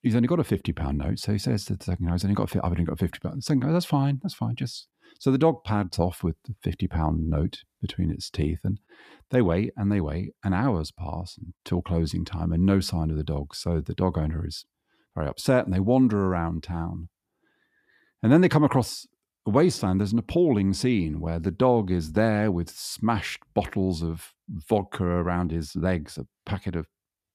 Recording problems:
none

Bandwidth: 14.5 kHz